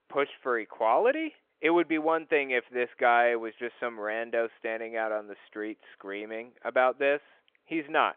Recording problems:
phone-call audio; nothing above 3.5 kHz

